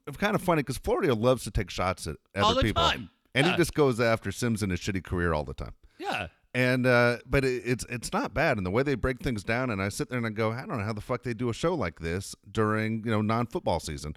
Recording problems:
none

